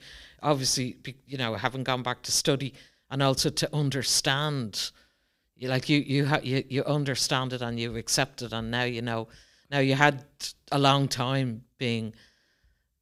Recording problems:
none

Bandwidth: 15.5 kHz